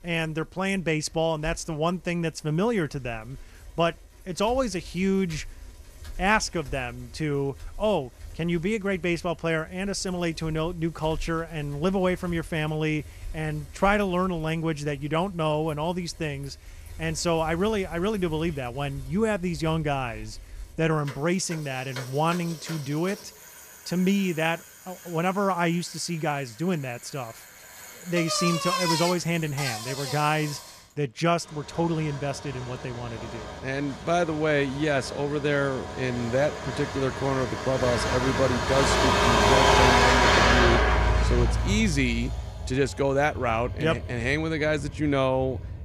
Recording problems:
traffic noise; very loud; throughout; as loud as the speech

